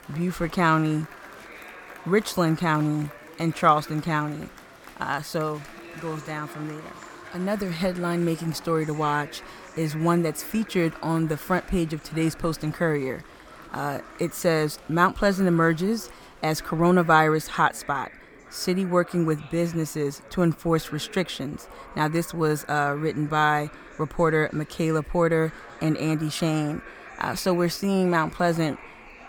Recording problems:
murmuring crowd; noticeable; throughout; 20 dB below the speech

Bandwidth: 18 kHz